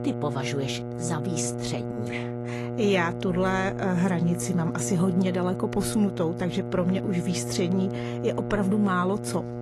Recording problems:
garbled, watery; slightly; nothing above 11.5 kHz
electrical hum; loud; throughout; 60 Hz, 7 dB below the speech

